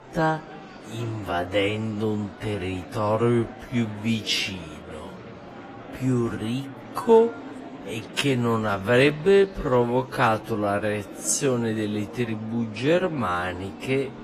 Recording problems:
wrong speed, natural pitch; too slow; 0.5 times normal speed
garbled, watery; slightly
murmuring crowd; noticeable; throughout; 15 dB below the speech

